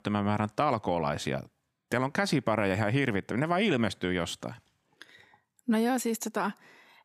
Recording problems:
none

